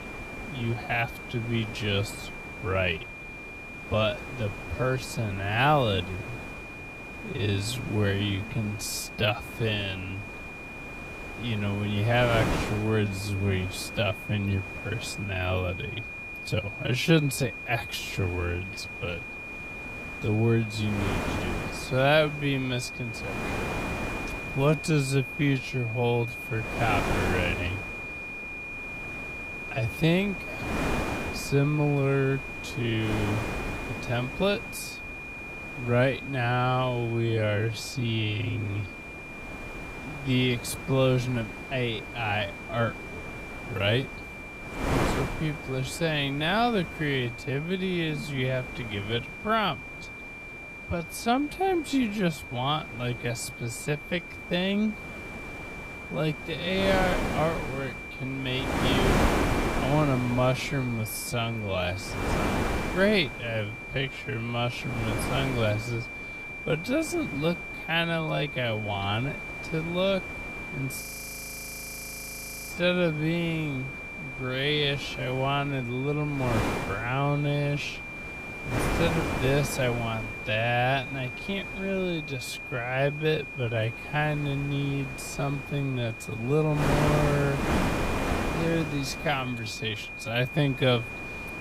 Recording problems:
wrong speed, natural pitch; too slow; 0.5 times normal speed
wind noise on the microphone; heavy; 7 dB below the speech
high-pitched whine; loud; throughout; 2.5 kHz, 9 dB below the speech
audio freezing; at 1:11 for 1.5 s

